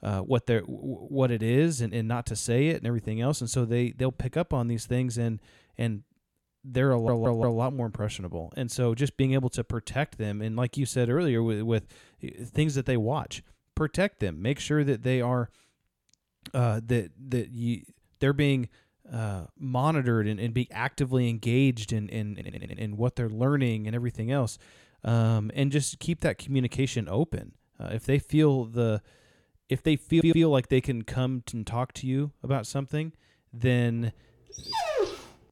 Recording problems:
audio stuttering; at 7 s, at 22 s and at 30 s
dog barking; noticeable; at 35 s; peak level with the speech

